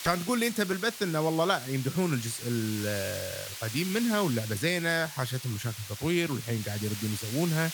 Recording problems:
hiss; loud; throughout; 8 dB below the speech

